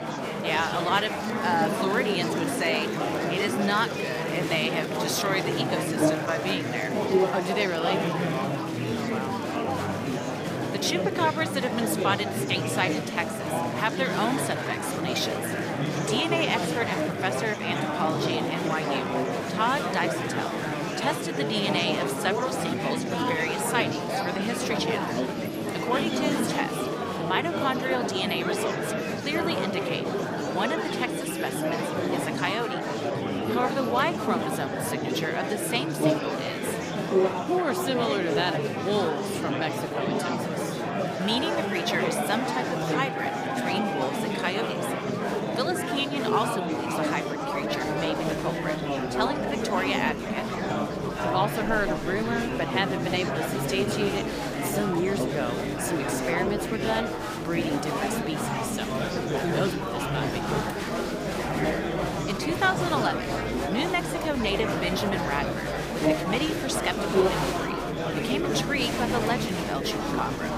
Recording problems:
murmuring crowd; very loud; throughout; 1 dB above the speech

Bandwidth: 15 kHz